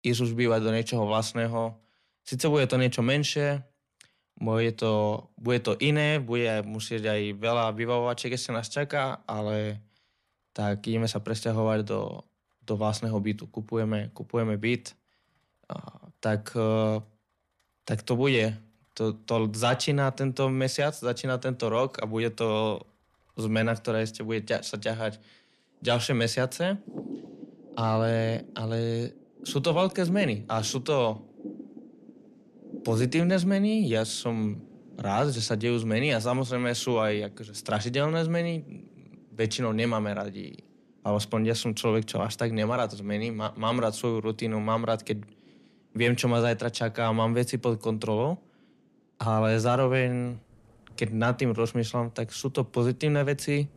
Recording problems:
rain or running water; faint; throughout; 20 dB below the speech

